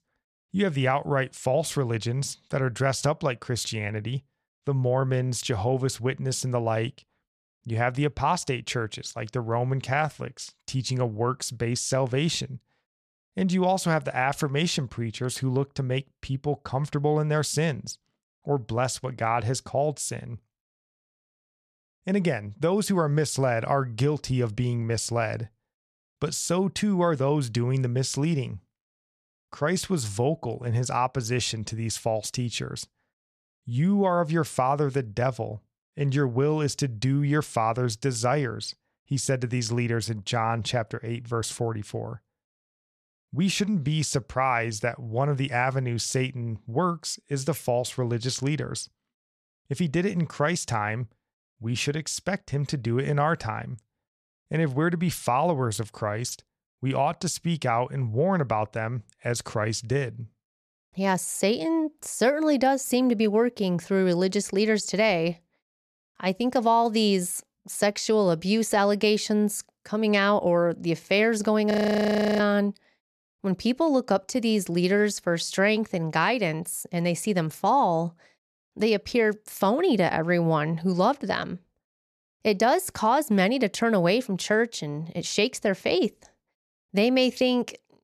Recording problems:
audio freezing; at 1:12 for 0.5 s

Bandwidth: 13.5 kHz